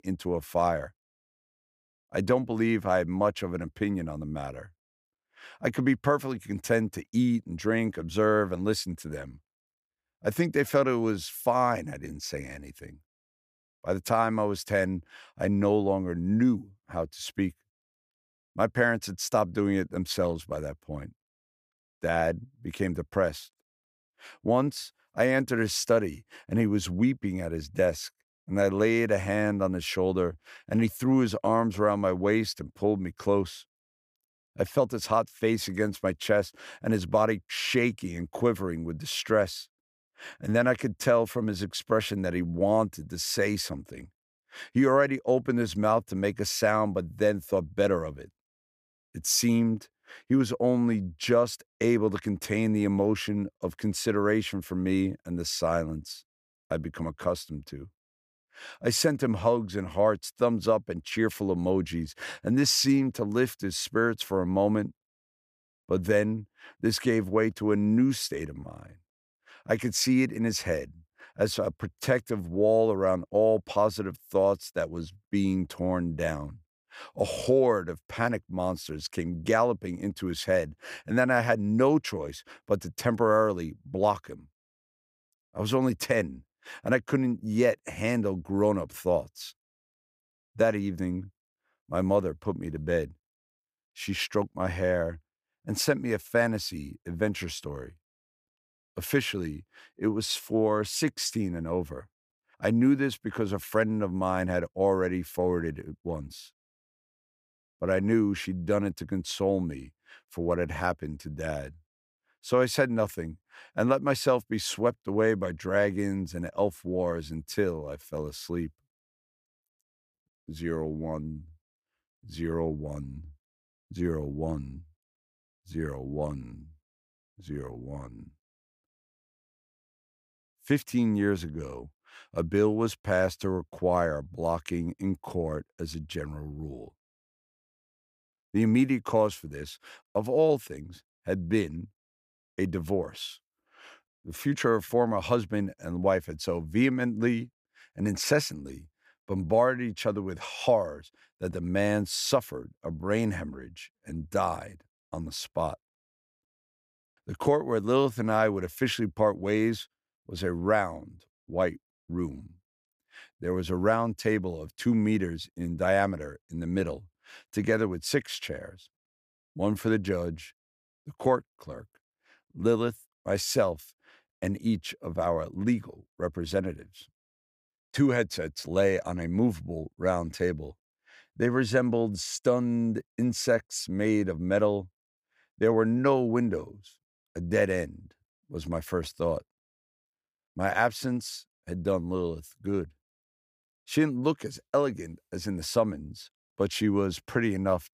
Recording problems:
none

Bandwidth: 15 kHz